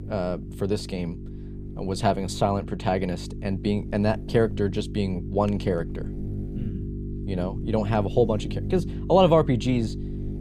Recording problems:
electrical hum; noticeable; throughout; 50 Hz, 15 dB below the speech

